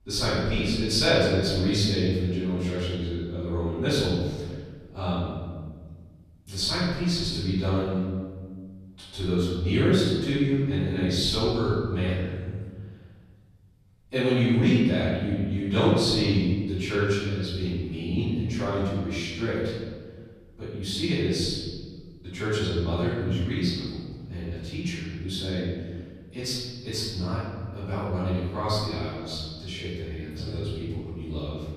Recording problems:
room echo; strong; dies away in 1.6 s
off-mic speech; far

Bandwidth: 14.5 kHz